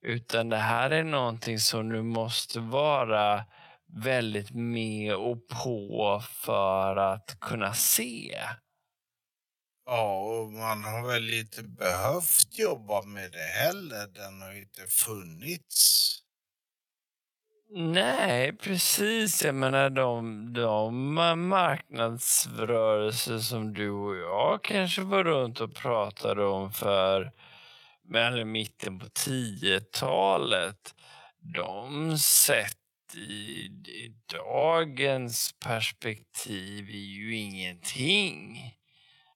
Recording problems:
wrong speed, natural pitch; too slow; 0.5 times normal speed
thin; somewhat; fading below 1 kHz

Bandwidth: 17.5 kHz